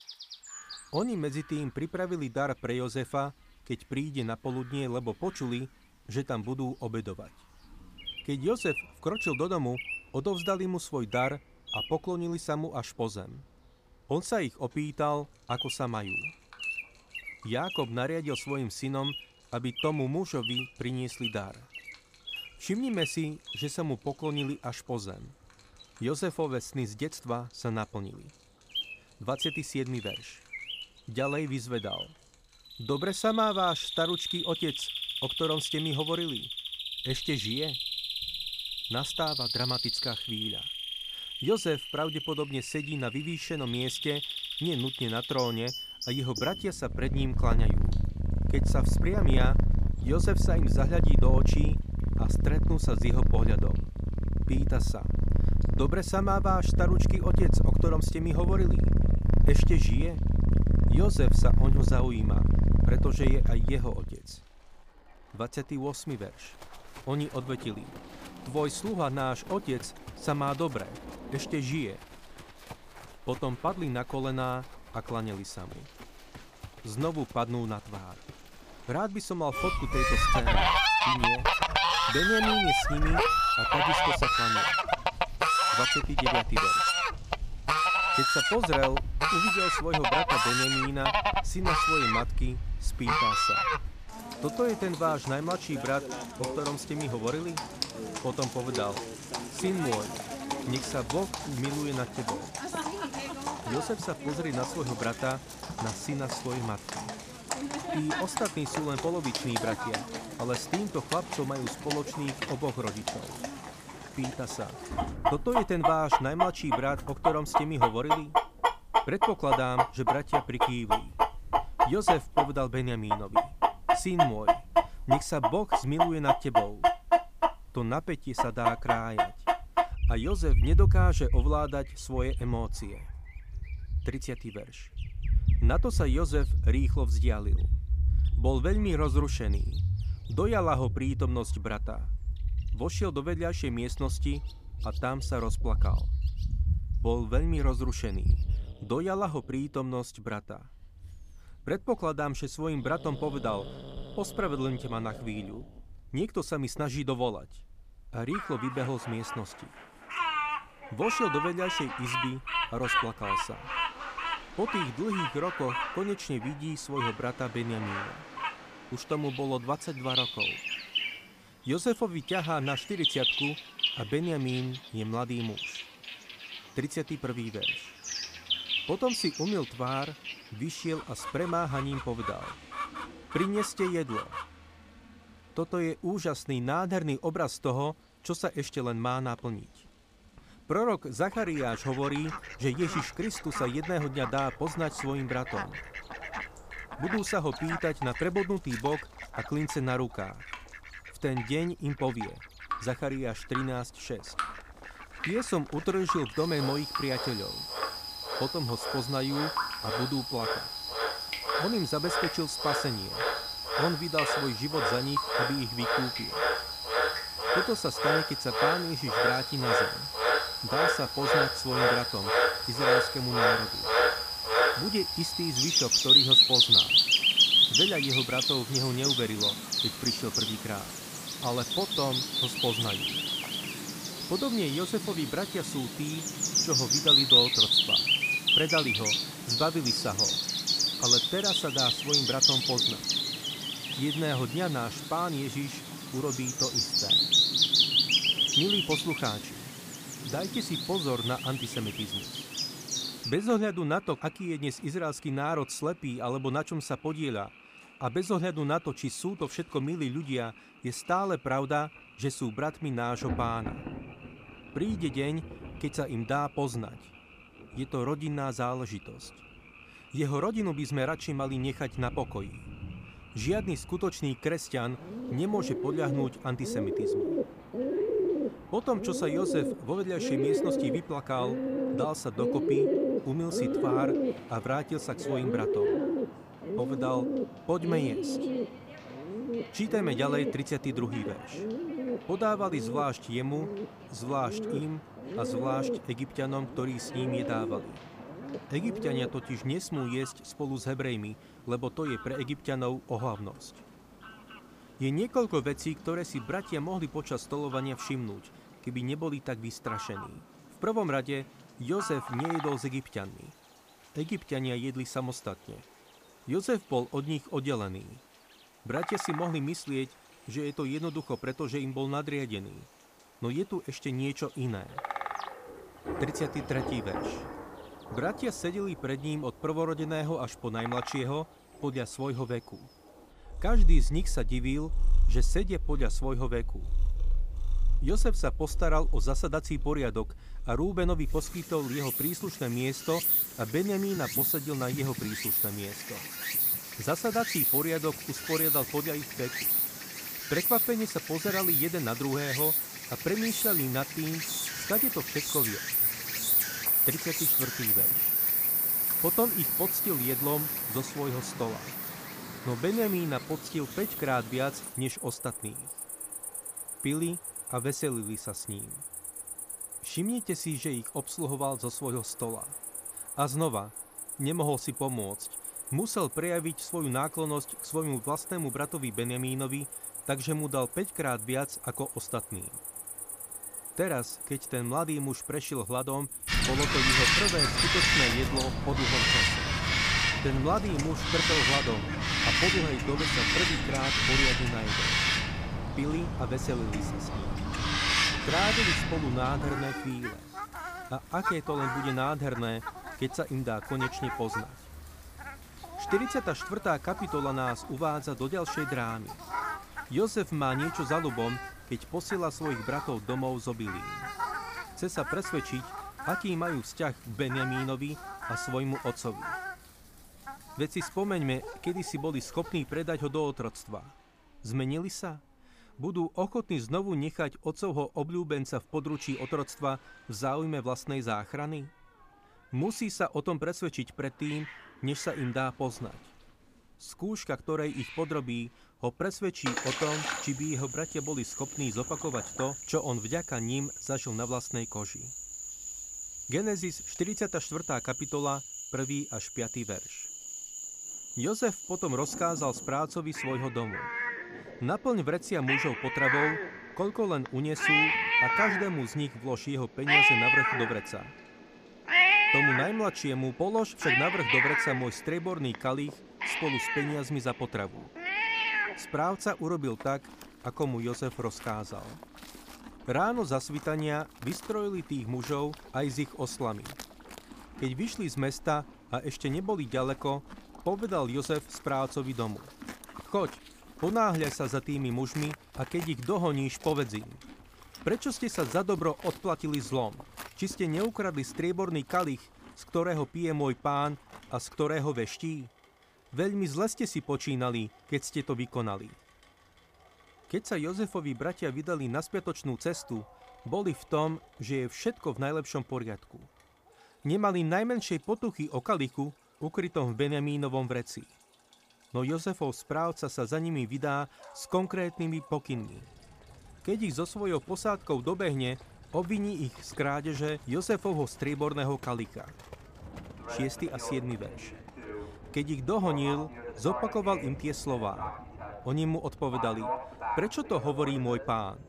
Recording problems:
animal sounds; very loud; throughout; 4 dB above the speech
rain or running water; noticeable; throughout; 15 dB below the speech

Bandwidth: 15 kHz